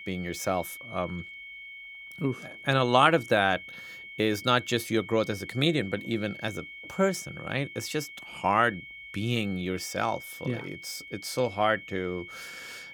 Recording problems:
high-pitched whine; noticeable; throughout; 2 kHz, 15 dB below the speech

